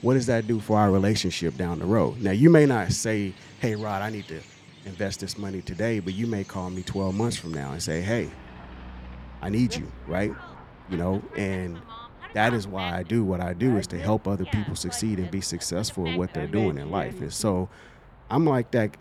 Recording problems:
animal sounds; noticeable; throughout; 15 dB below the speech

